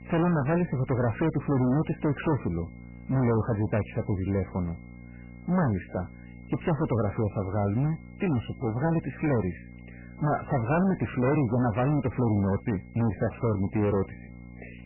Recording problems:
distortion; heavy; 16% of the sound clipped
garbled, watery; badly; nothing above 3 kHz
electrical hum; faint; throughout; 60 Hz, 25 dB below the speech
high-pitched whine; faint; throughout; 2 kHz, 30 dB below the speech

